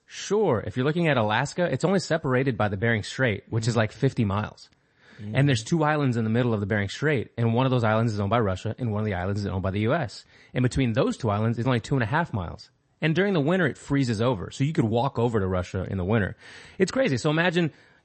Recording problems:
garbled, watery; slightly; nothing above 8 kHz

